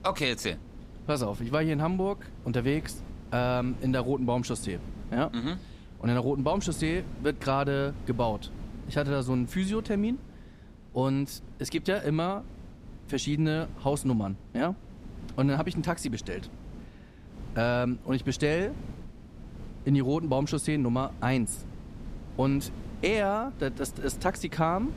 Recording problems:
wind noise on the microphone; occasional gusts; 20 dB below the speech

